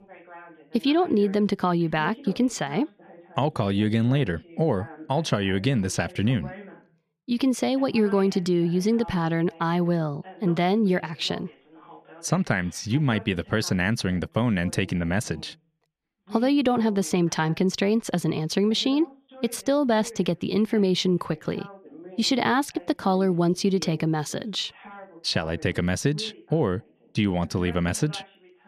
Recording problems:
voice in the background; faint; throughout; 20 dB below the speech

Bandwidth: 14.5 kHz